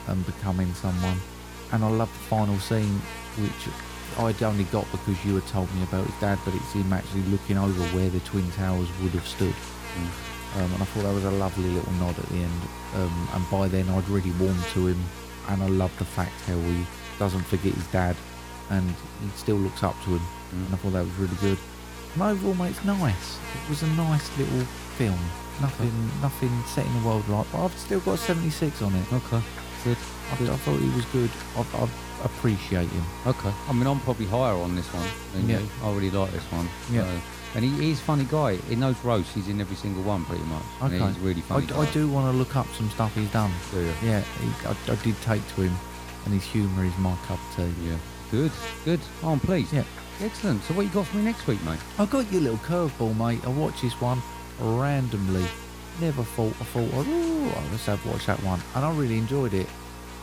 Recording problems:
electrical hum; loud; throughout; 60 Hz, 7 dB below the speech

